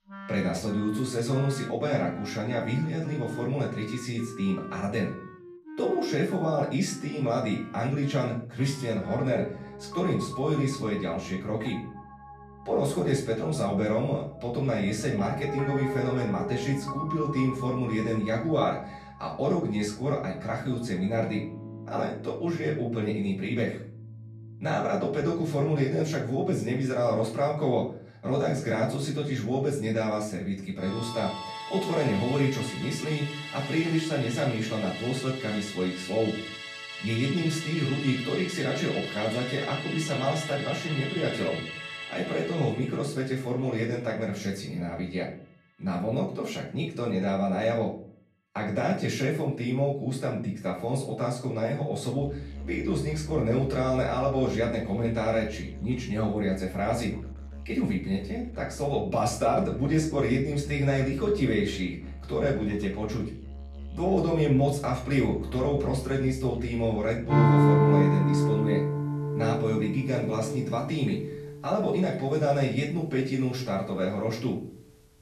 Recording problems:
off-mic speech; far
room echo; slight; dies away in 0.4 s
background music; loud; throughout; 6 dB below the speech

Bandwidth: 13.5 kHz